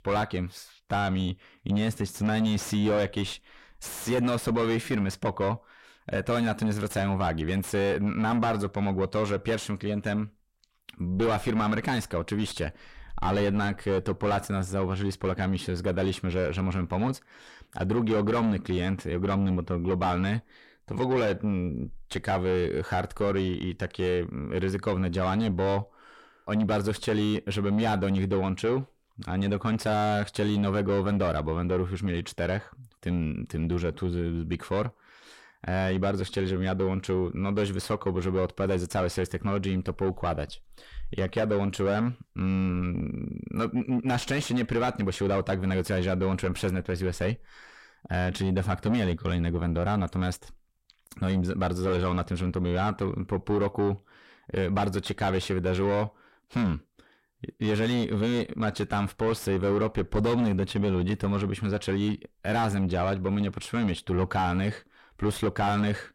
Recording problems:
distortion; heavy; 7 dB below the speech

